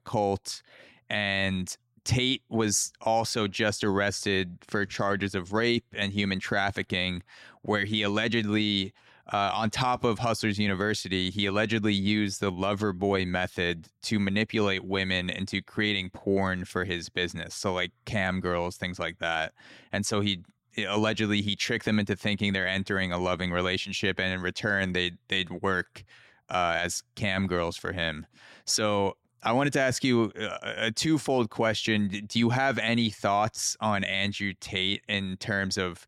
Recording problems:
none

